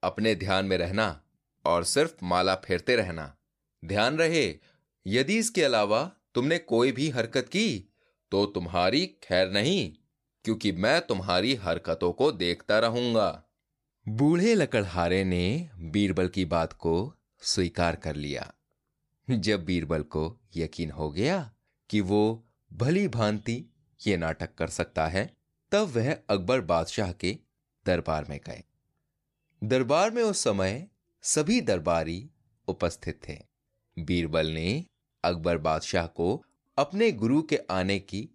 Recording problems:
none

